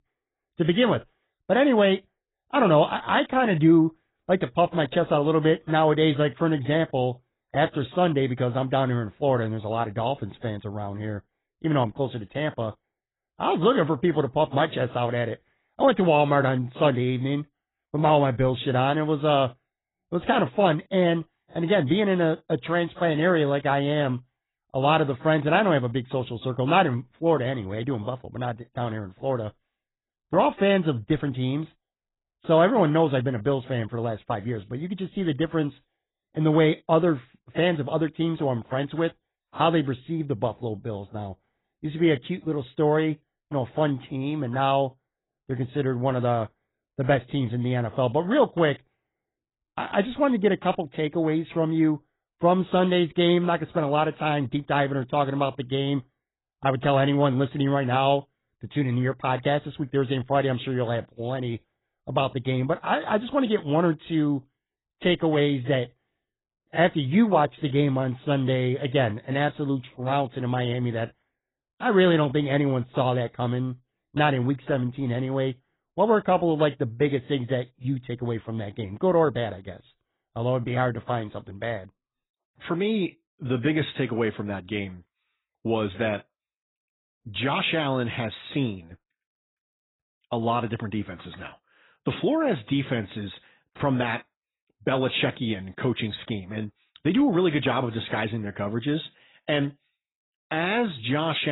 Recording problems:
garbled, watery; badly; nothing above 4 kHz
abrupt cut into speech; at the end

